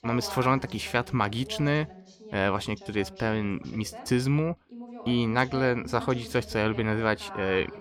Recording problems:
voice in the background; noticeable; throughout; 15 dB below the speech

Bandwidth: 18 kHz